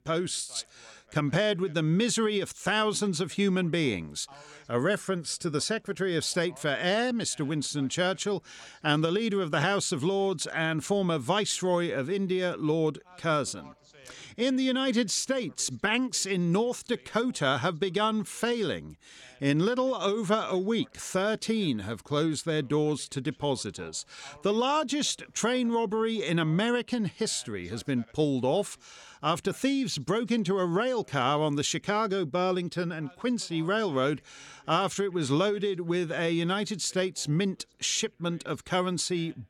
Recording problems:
voice in the background; faint; throughout; 30 dB below the speech

